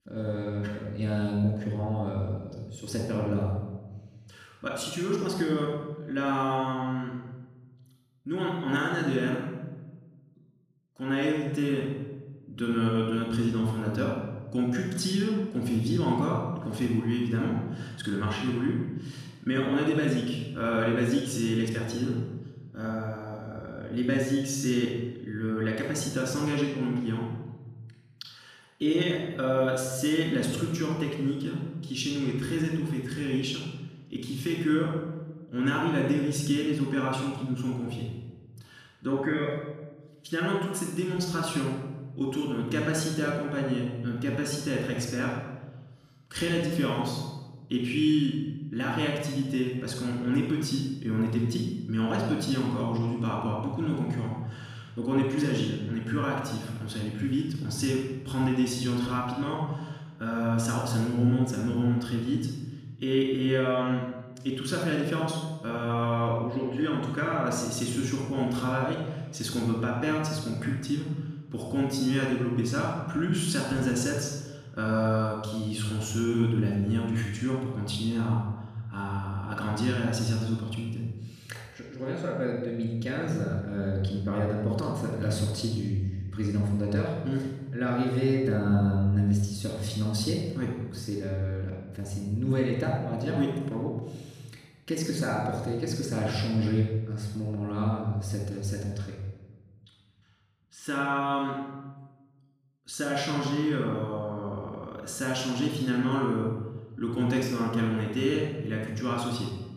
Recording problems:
off-mic speech; far
room echo; noticeable; dies away in 1 s

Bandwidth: 14.5 kHz